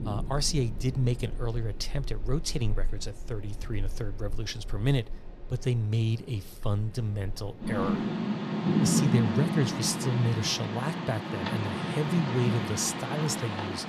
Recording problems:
rain or running water; loud; throughout; 2 dB below the speech

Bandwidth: 15 kHz